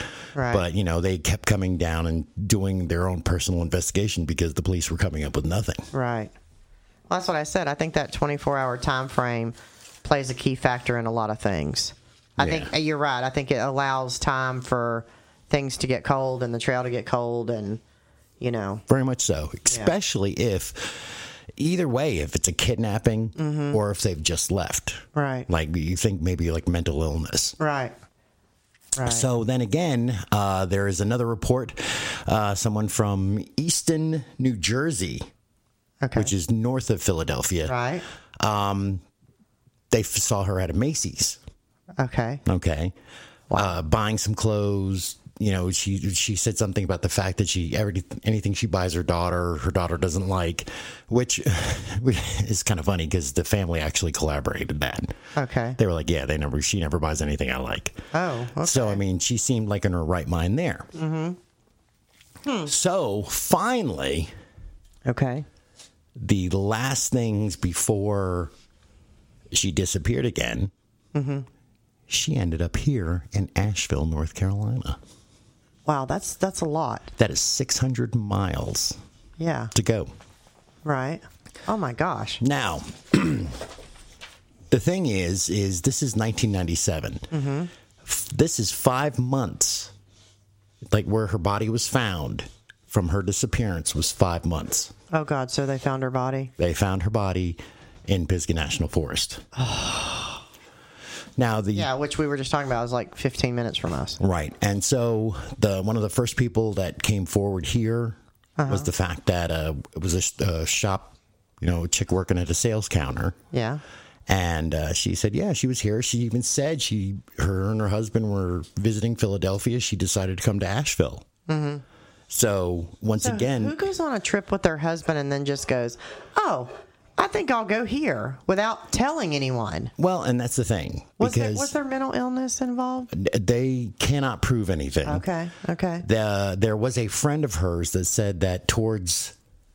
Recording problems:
squashed, flat; heavily

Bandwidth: 16 kHz